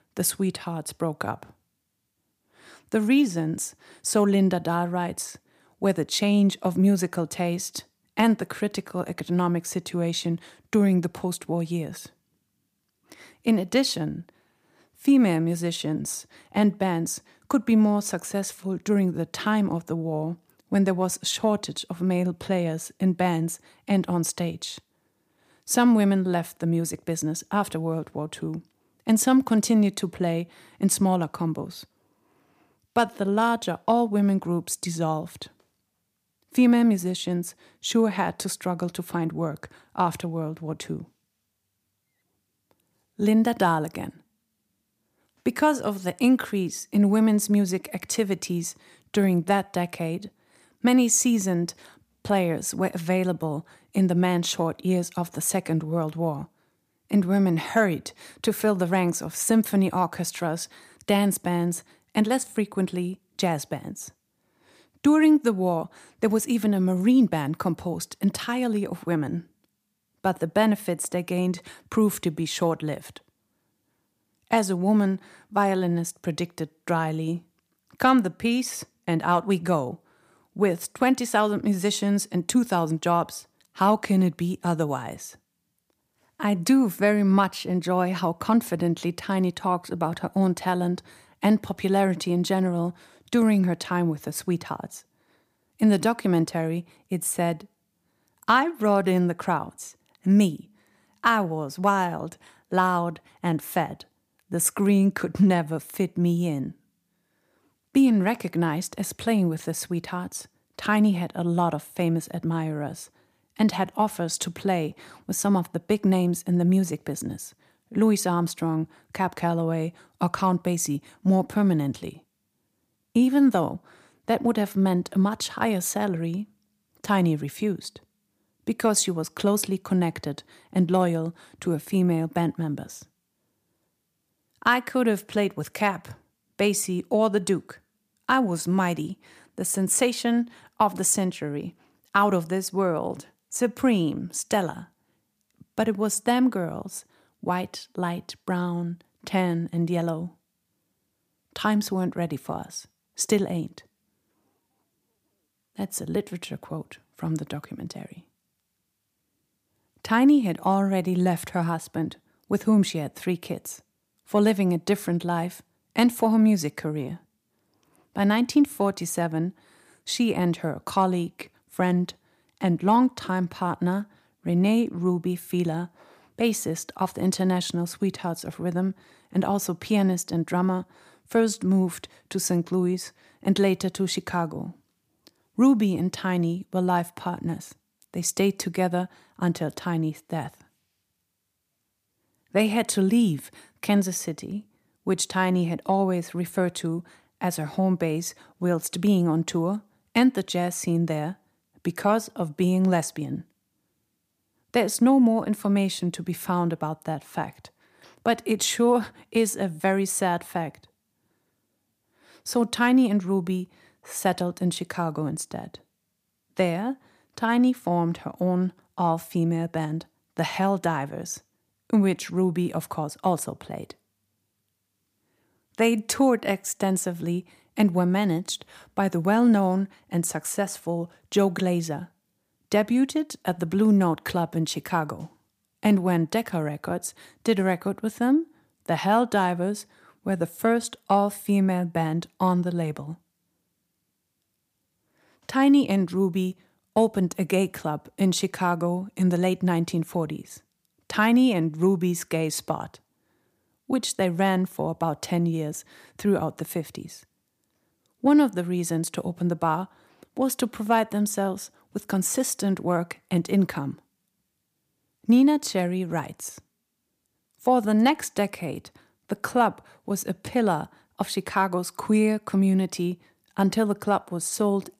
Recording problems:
none

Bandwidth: 15 kHz